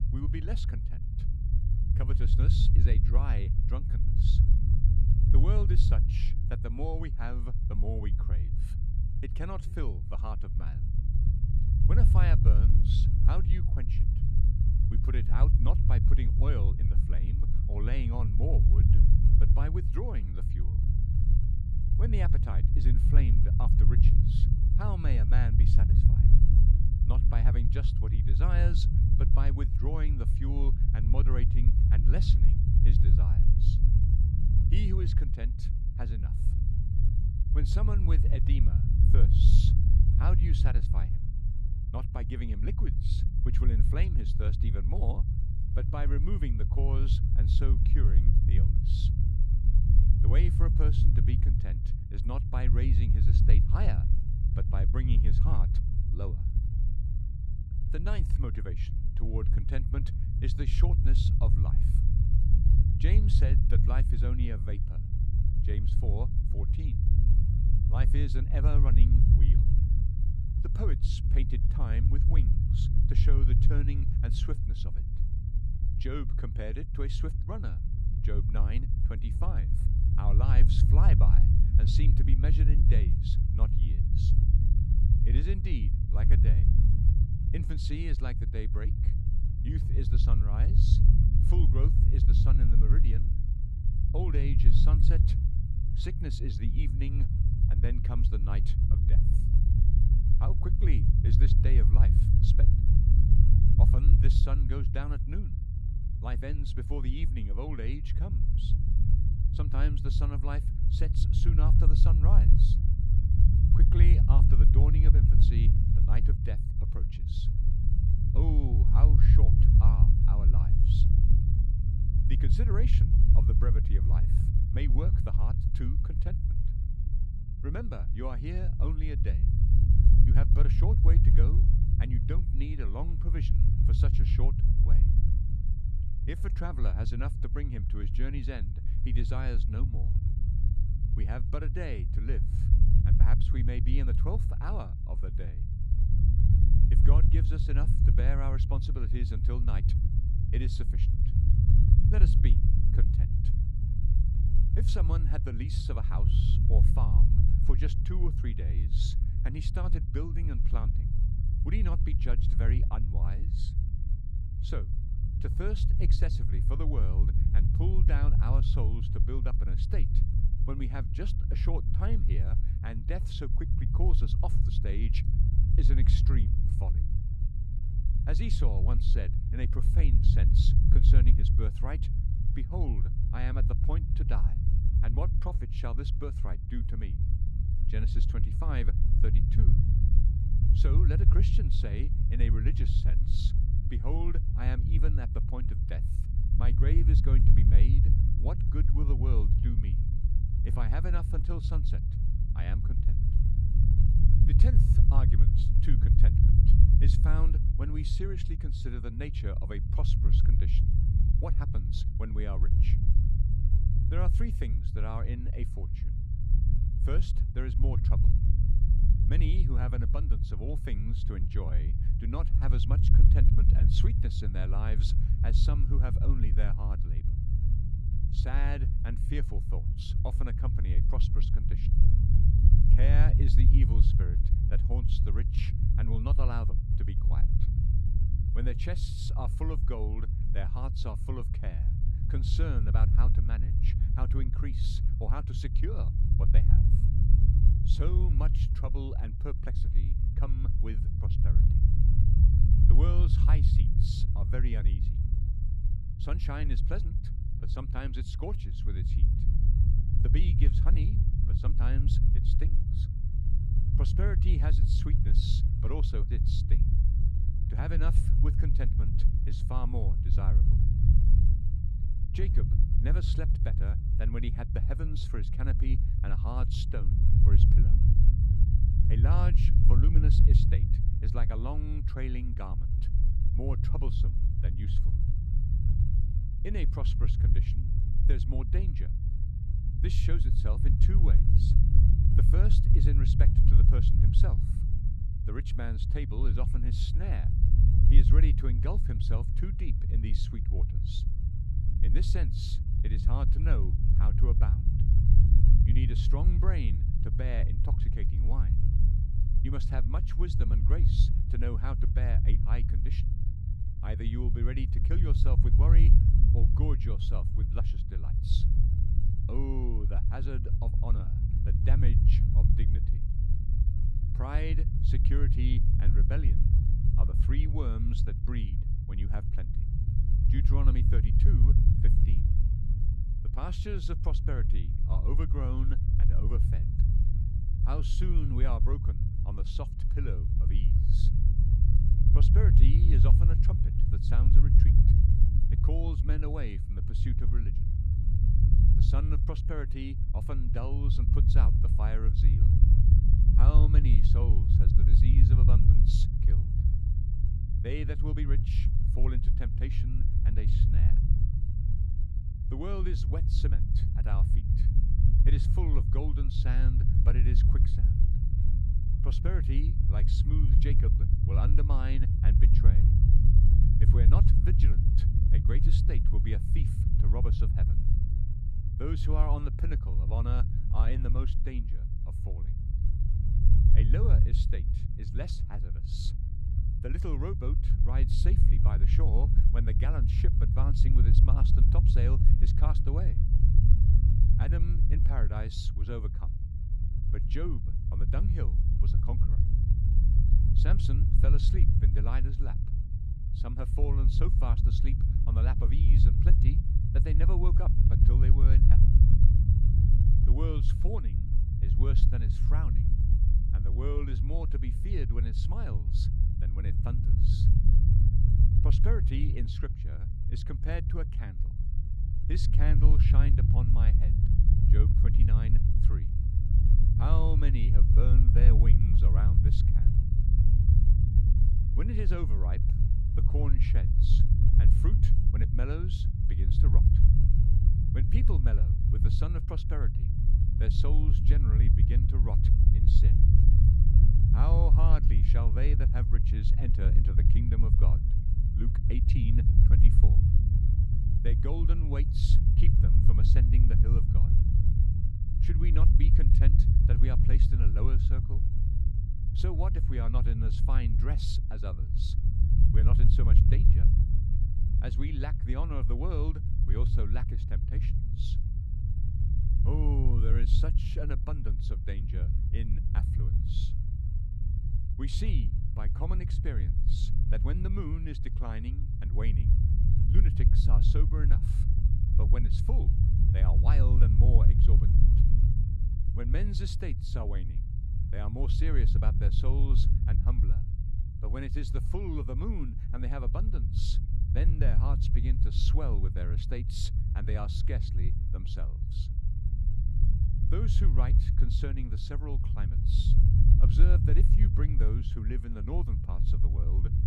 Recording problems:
low rumble; loud; throughout; as loud as the speech

